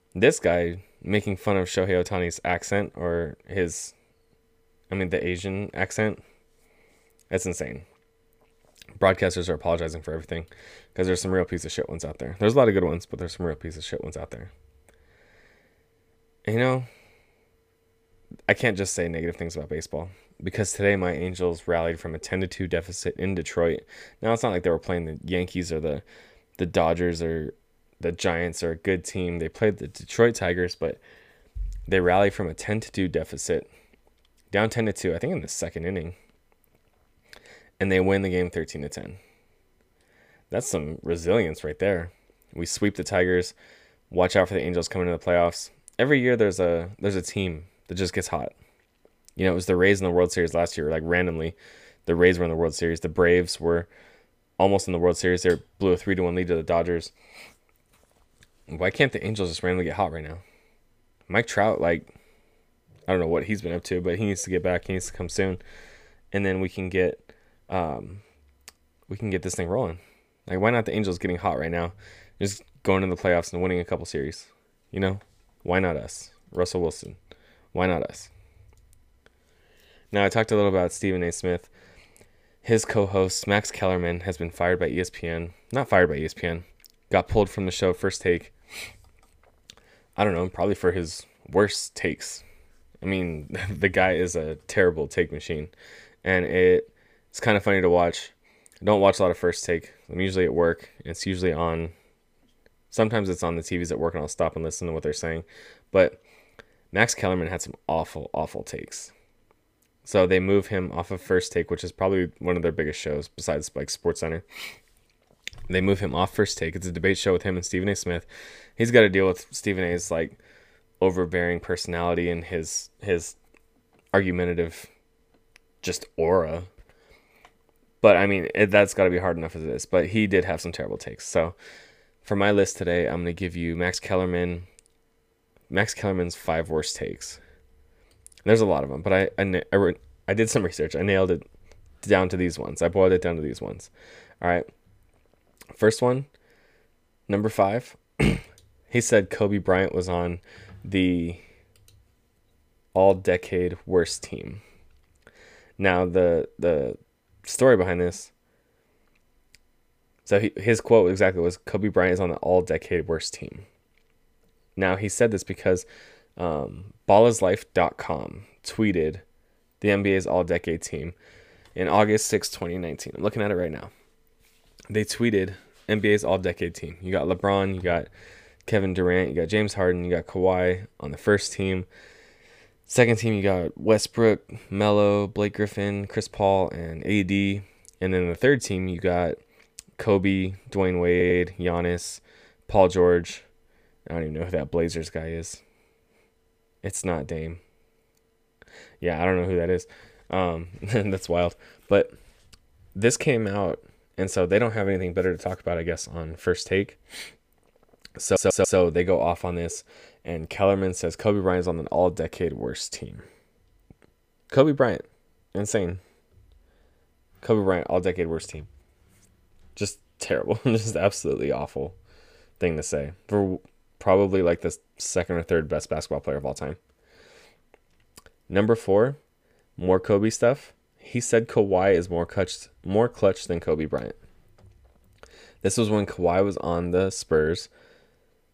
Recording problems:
audio stuttering; at 3:11 and at 3:28

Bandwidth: 15 kHz